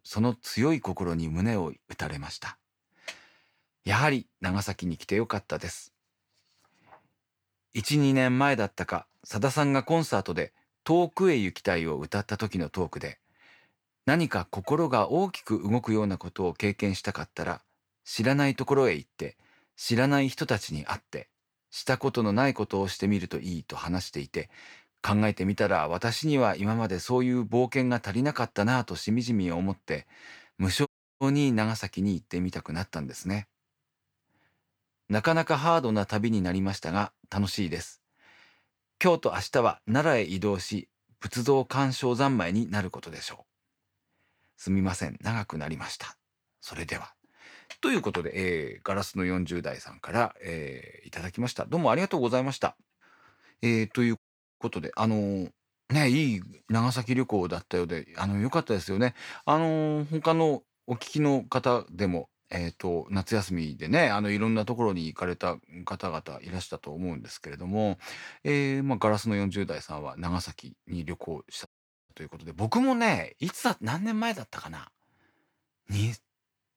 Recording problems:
audio cutting out; at 31 s, at 54 s and at 1:12

